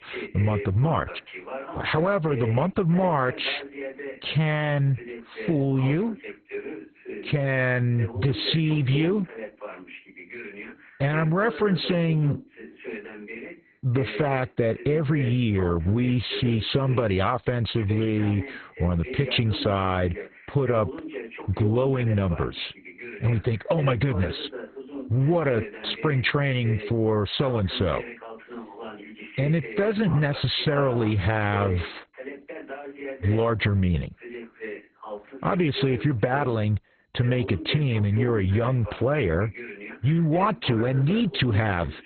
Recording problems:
garbled, watery; badly; nothing above 4 kHz
voice in the background; noticeable; throughout; 15 dB below the speech

